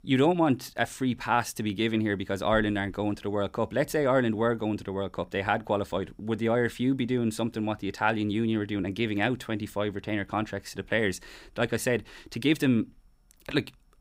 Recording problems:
none

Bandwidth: 15.5 kHz